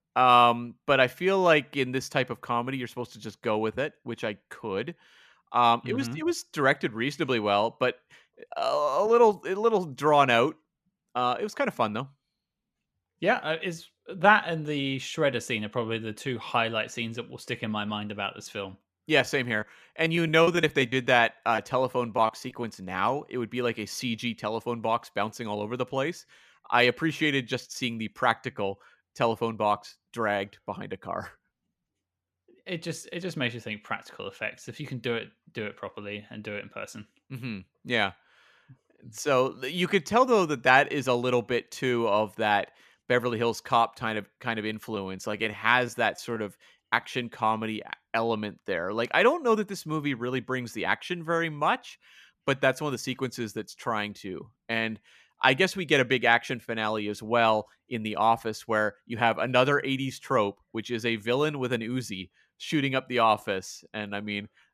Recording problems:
choppy; very; from 19 to 23 s and from 44 to 47 s; 8% of the speech affected

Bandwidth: 14.5 kHz